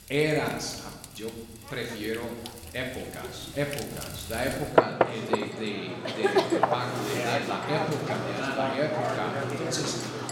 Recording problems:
room echo; noticeable; dies away in 1 s
off-mic speech; somewhat distant
household noises; very loud; throughout; 3 dB above the speech

